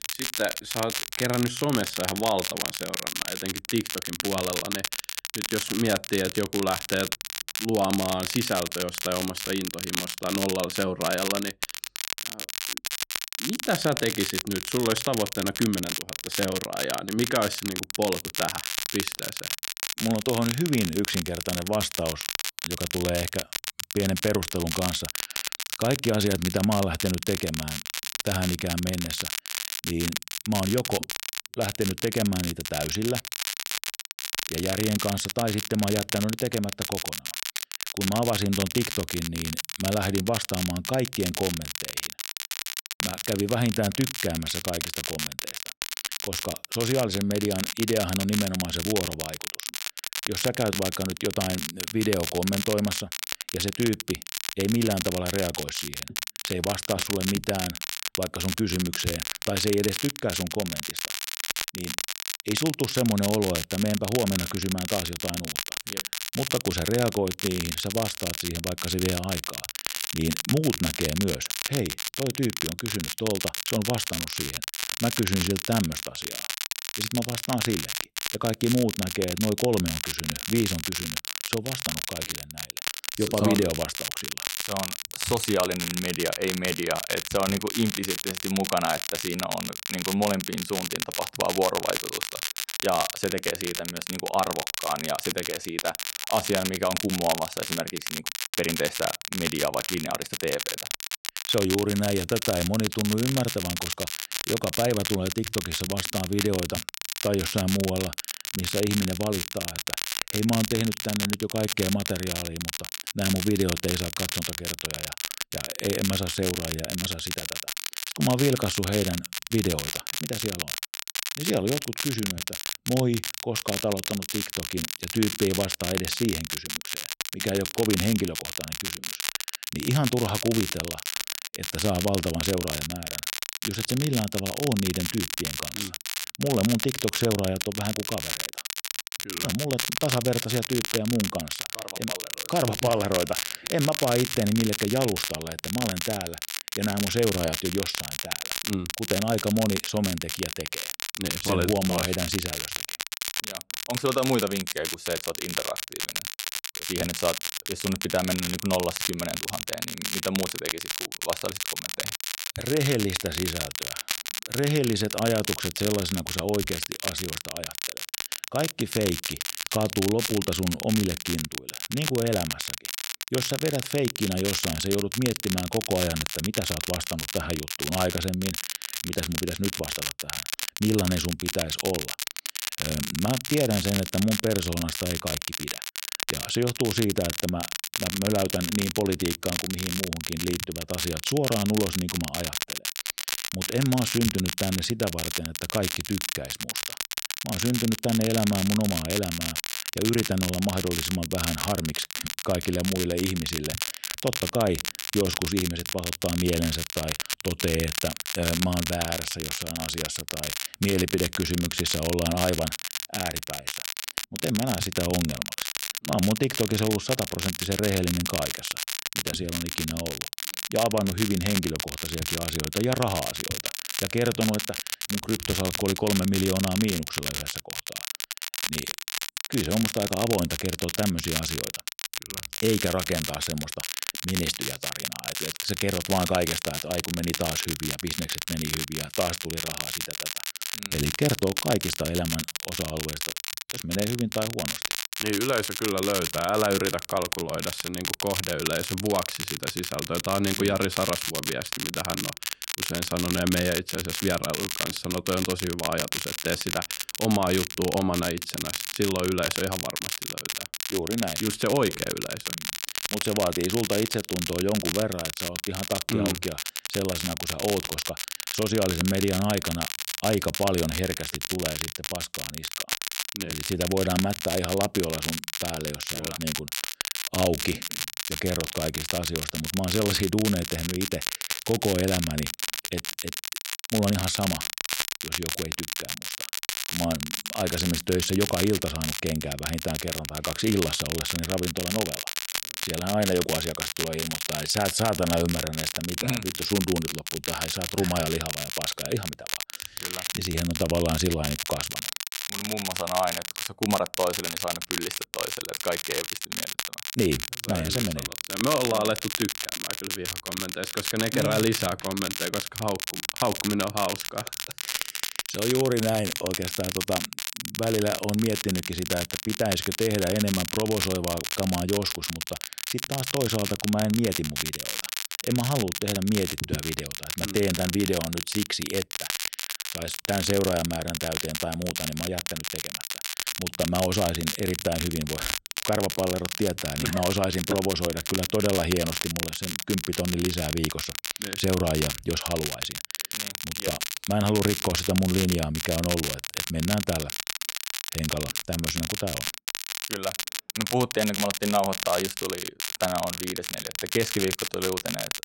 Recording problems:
crackle, like an old record; loud; 2 dB below the speech

